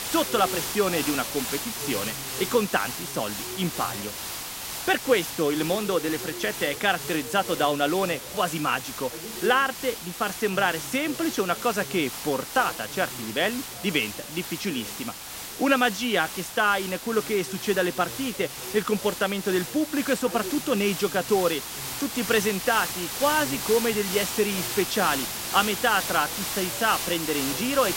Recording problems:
hiss; loud; throughout; 6 dB below the speech
voice in the background; noticeable; throughout; 20 dB below the speech

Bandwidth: 16 kHz